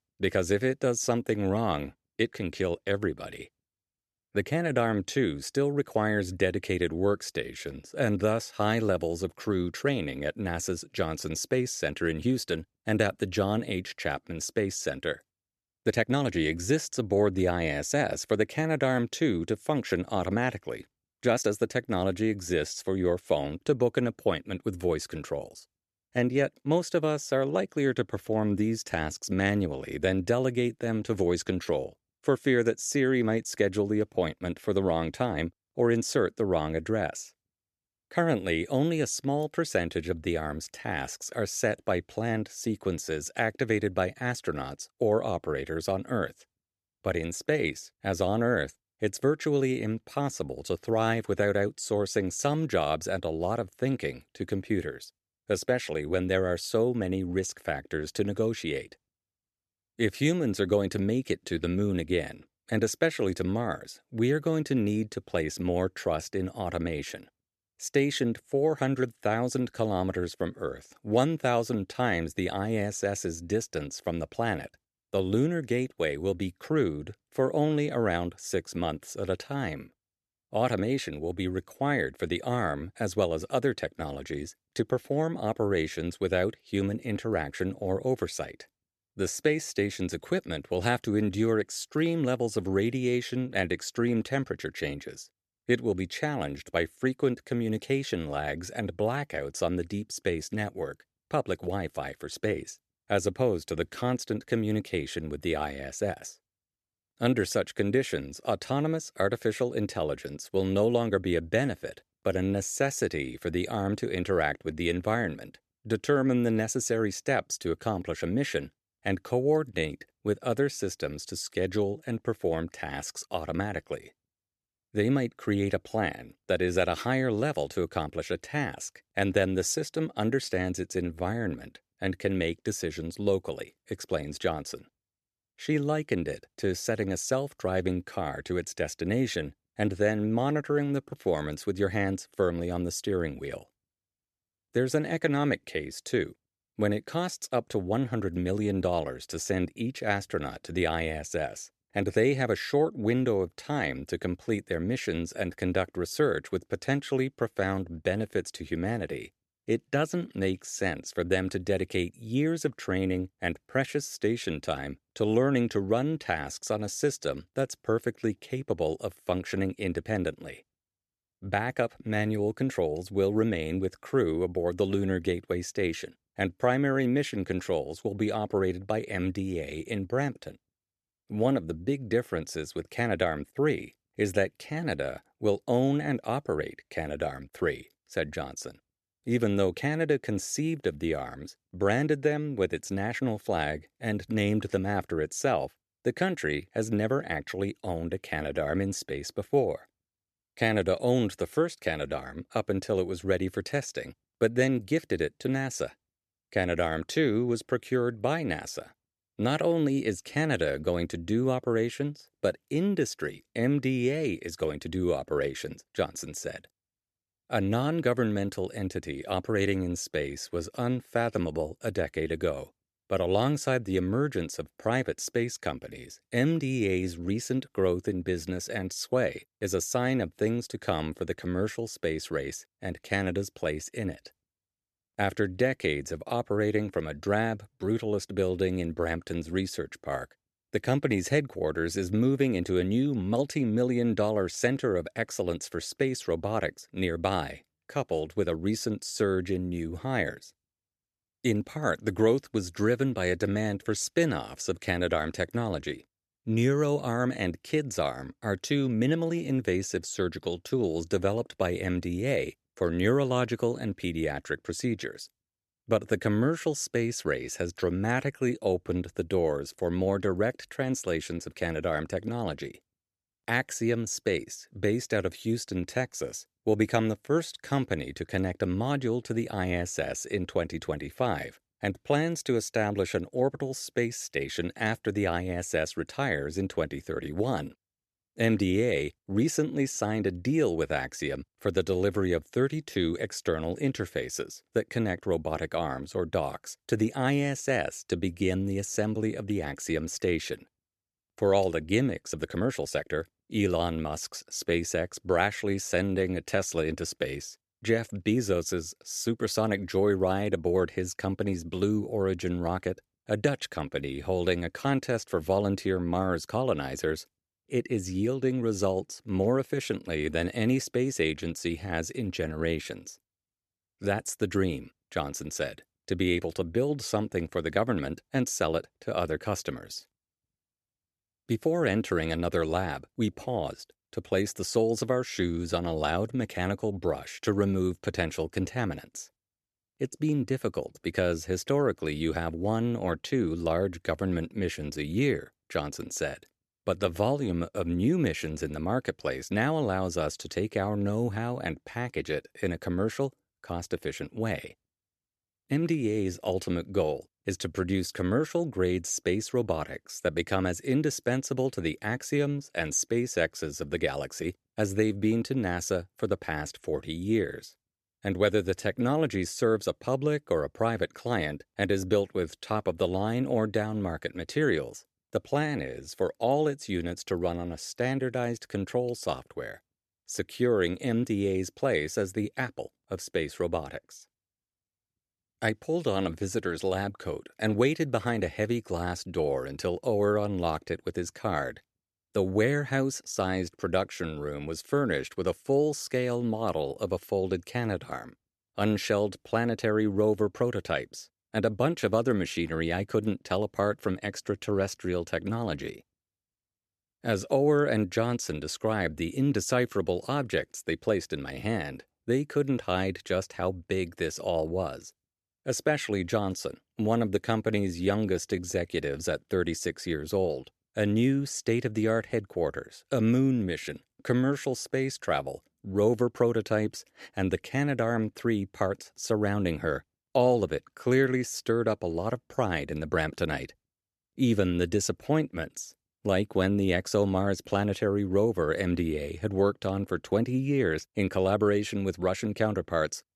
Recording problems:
uneven, jittery; strongly; from 16 s to 6:59

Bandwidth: 13.5 kHz